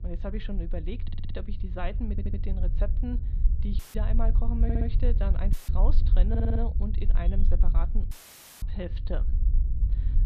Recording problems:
muffled; very slightly; fading above 4 kHz
low rumble; loud; throughout; 9 dB below the speech
audio stuttering; 4 times, first at 1 s
audio cutting out; filled with static; at 4 s, at 5.5 s and at 8 s for 0.5 s

